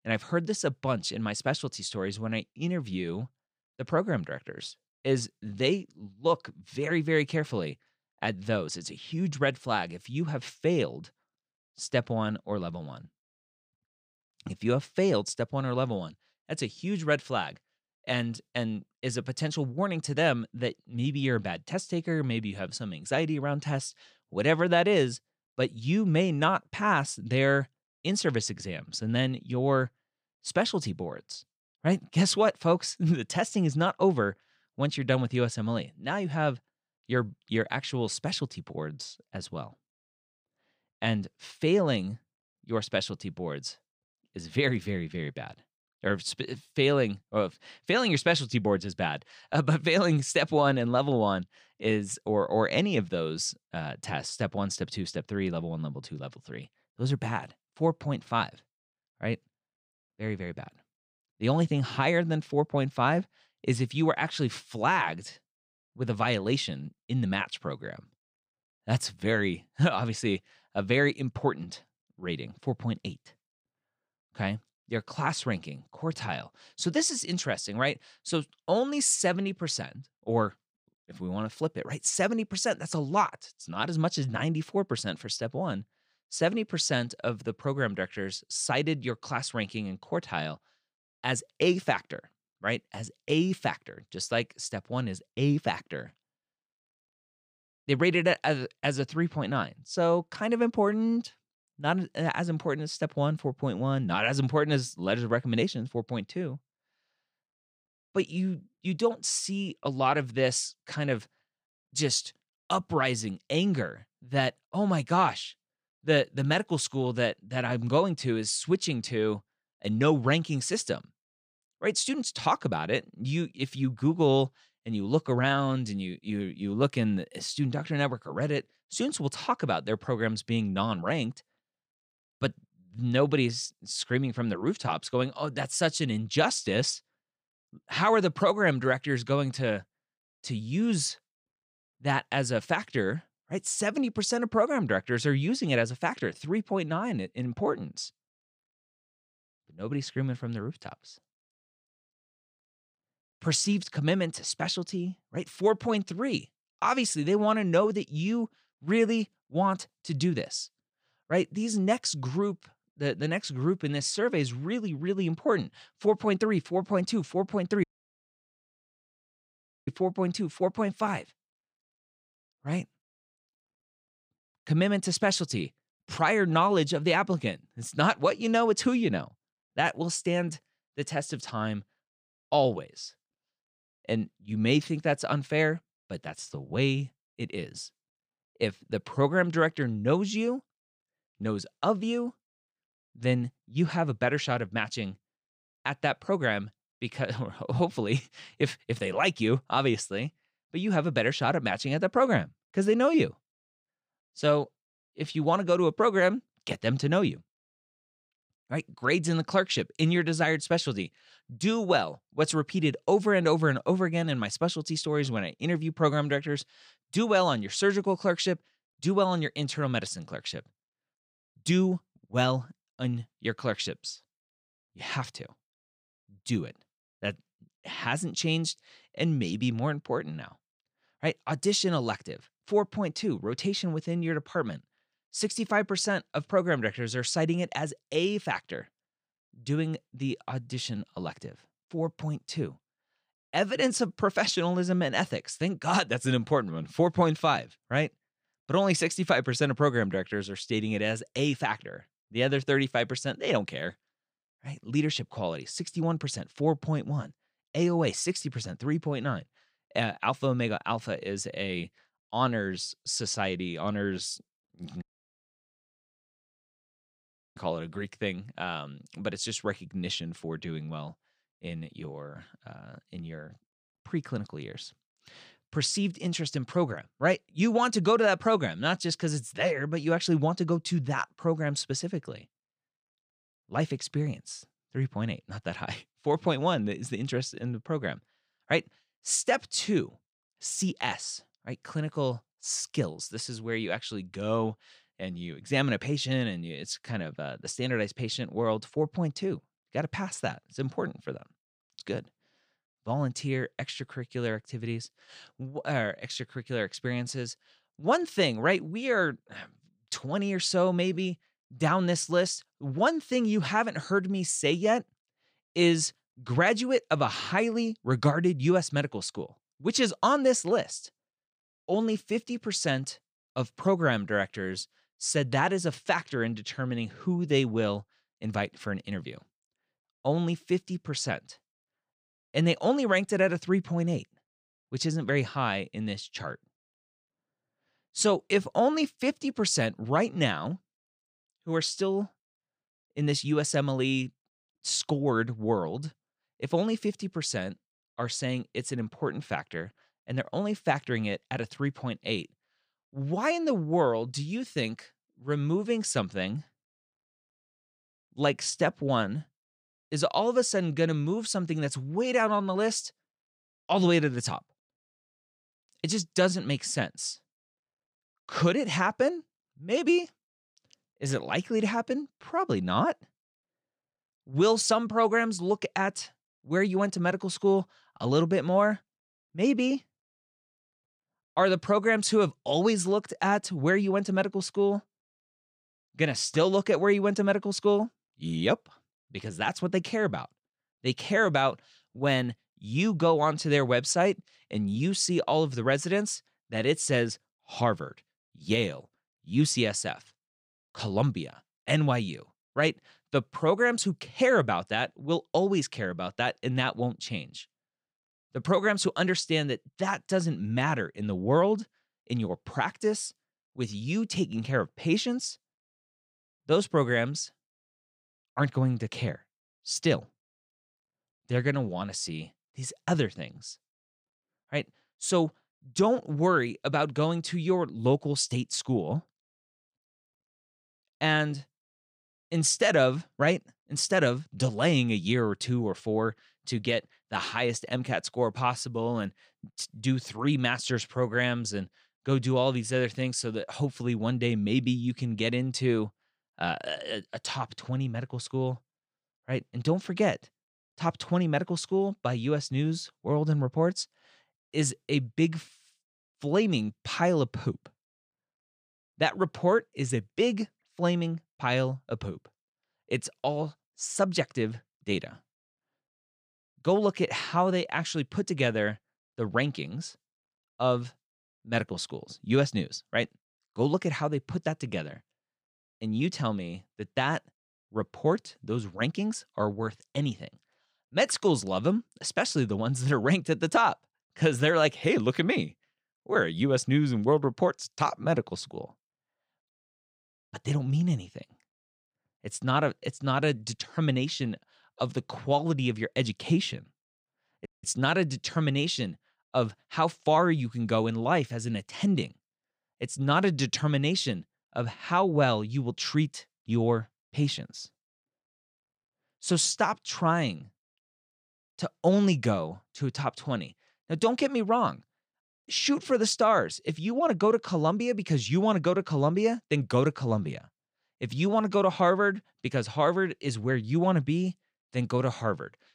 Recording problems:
audio cutting out; at 2:48 for 2 s, at 4:25 for 2.5 s and at 8:18

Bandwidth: 15 kHz